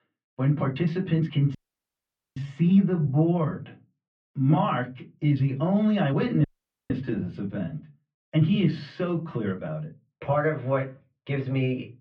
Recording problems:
off-mic speech; far
muffled; very; fading above 3 kHz
room echo; very slight; dies away in 0.2 s
uneven, jittery; strongly; from 0.5 to 11 s
audio cutting out; at 1.5 s for 1 s and at 6.5 s

